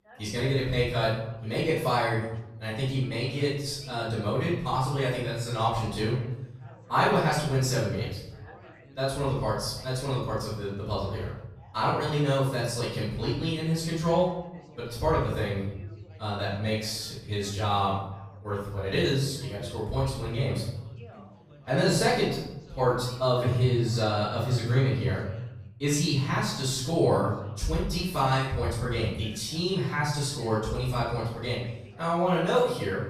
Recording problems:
off-mic speech; far
room echo; noticeable; dies away in 0.8 s
background chatter; faint; throughout; 3 voices, 25 dB below the speech

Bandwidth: 15 kHz